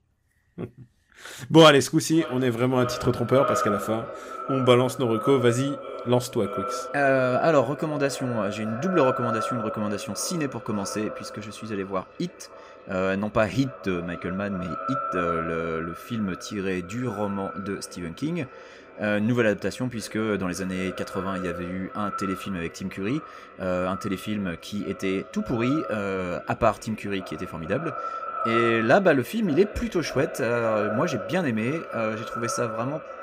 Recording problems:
echo of what is said; strong; throughout; 570 ms later, 8 dB below the speech

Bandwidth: 15.5 kHz